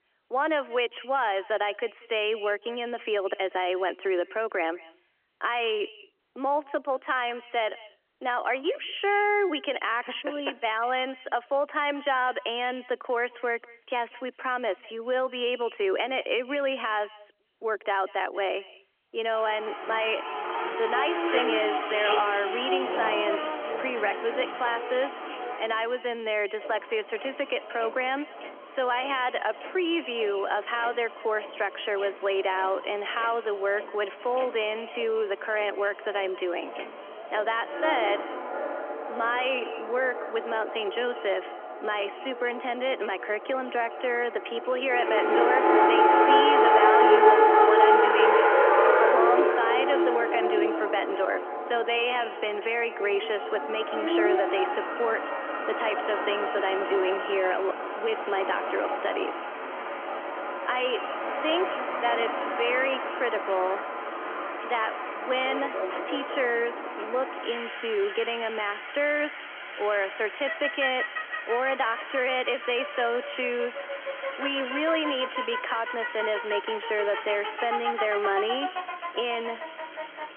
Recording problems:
echo of what is said; faint; throughout; 190 ms later, 20 dB below the speech
phone-call audio; nothing above 3.5 kHz
traffic noise; very loud; from 19 s on; 1 dB above the speech

